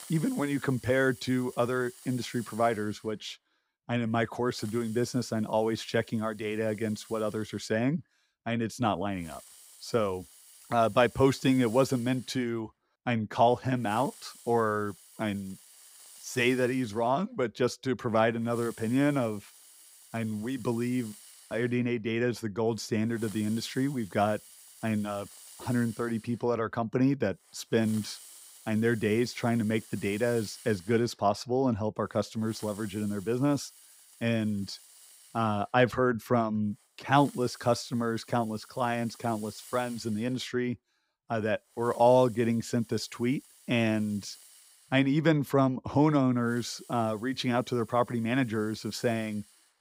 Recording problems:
hiss; faint; throughout; 20 dB below the speech

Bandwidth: 15.5 kHz